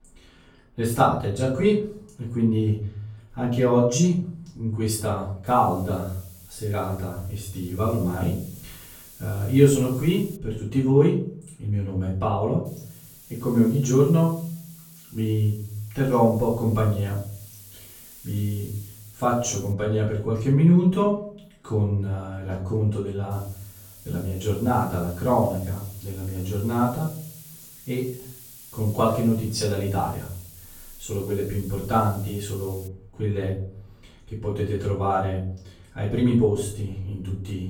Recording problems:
off-mic speech; far
room echo; noticeable; dies away in 0.7 s
hiss; noticeable; from 5.5 to 10 s, from 13 to 20 s and from 23 to 33 s; 20 dB below the speech

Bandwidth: 17 kHz